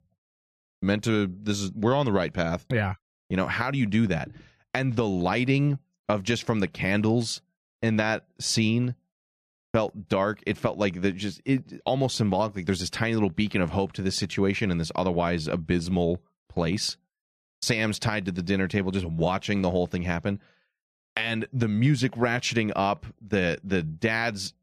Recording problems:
none

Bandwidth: 14 kHz